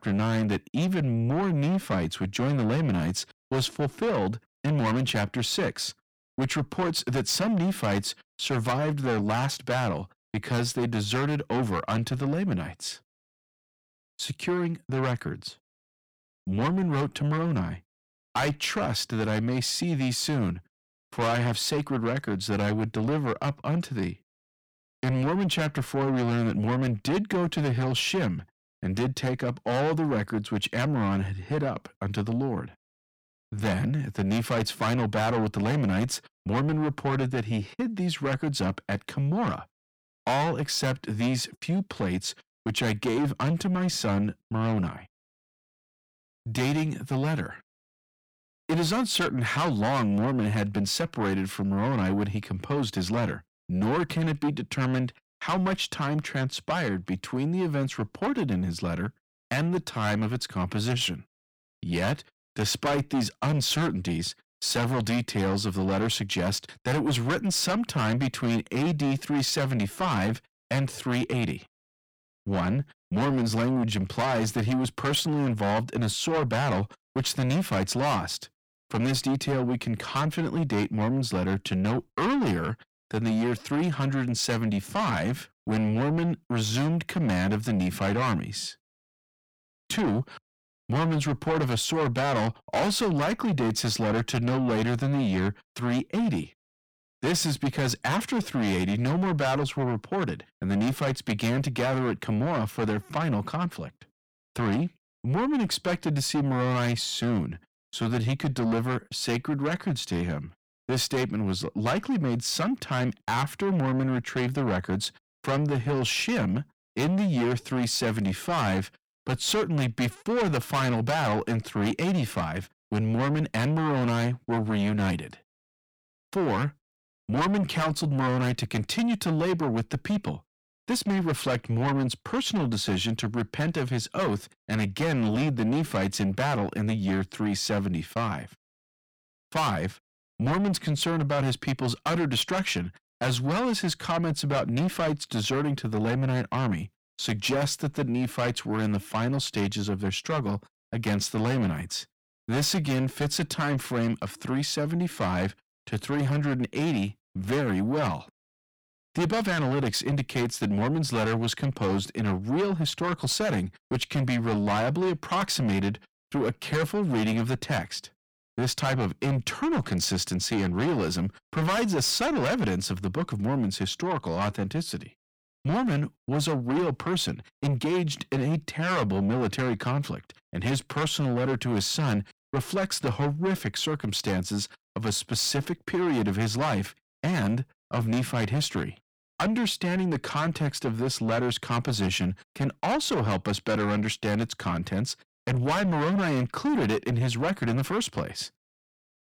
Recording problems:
distortion; heavy; 6 dB below the speech

